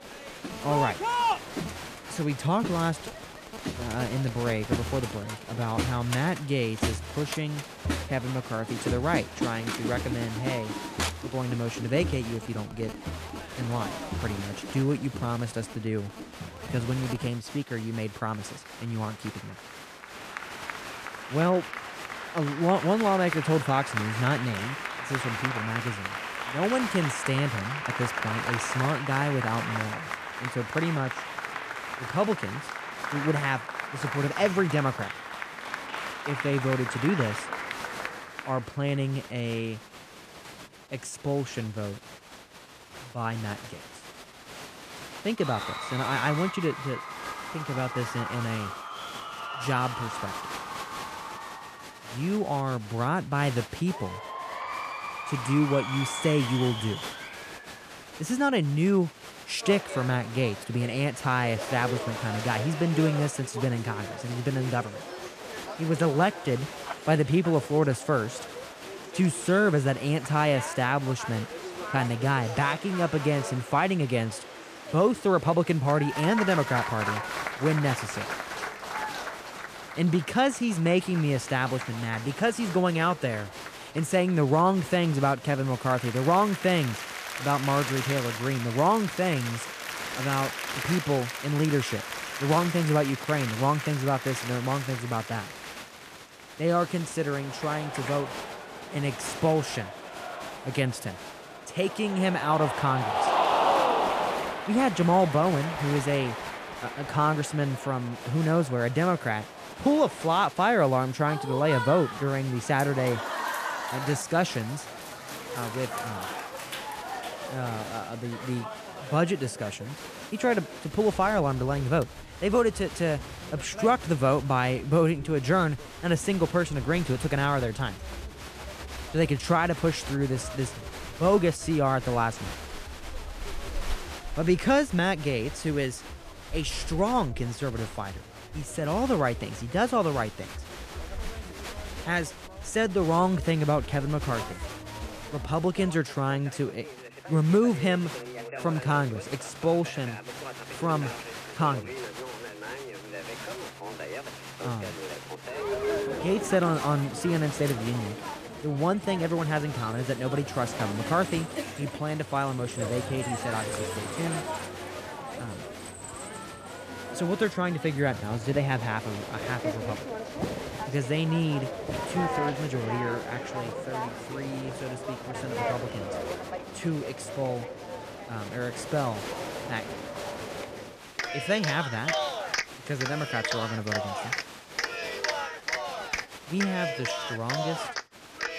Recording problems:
crowd noise; loud; throughout; 7 dB below the speech

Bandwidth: 14.5 kHz